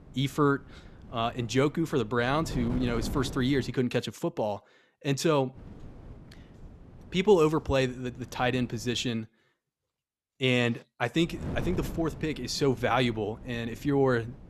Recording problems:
wind noise on the microphone; occasional gusts; until 3.5 s, from 5.5 to 9 s and from 11 s on; 20 dB below the speech

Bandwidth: 13.5 kHz